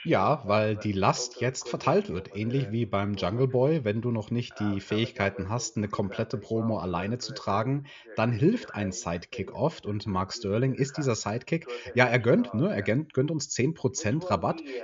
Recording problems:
high frequencies cut off; noticeable; nothing above 7 kHz
voice in the background; noticeable; throughout; 15 dB below the speech

